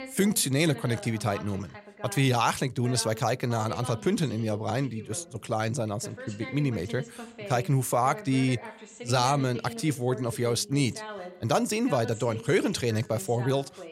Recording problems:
voice in the background; noticeable; throughout; 15 dB below the speech

